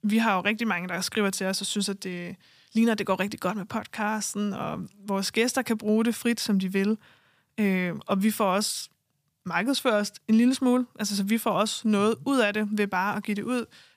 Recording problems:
none

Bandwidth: 15 kHz